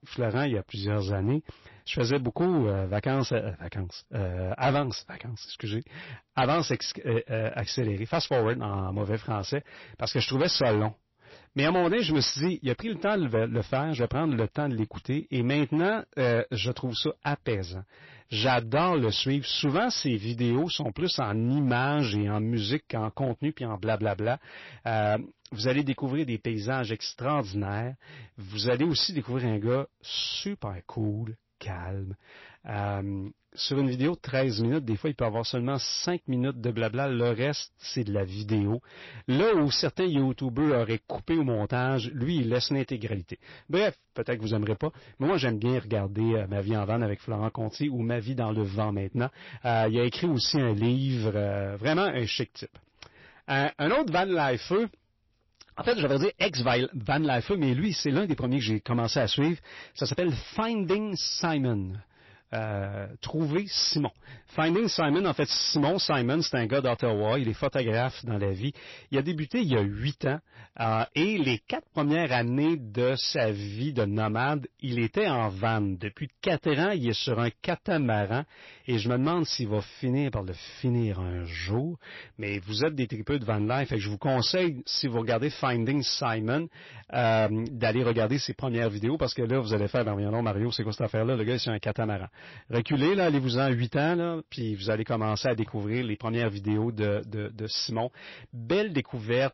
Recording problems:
distortion; slight; 7% of the sound clipped
garbled, watery; slightly; nothing above 5.5 kHz

